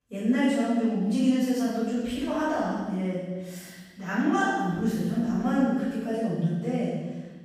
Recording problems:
room echo; strong; dies away in 1.3 s
off-mic speech; far

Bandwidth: 15.5 kHz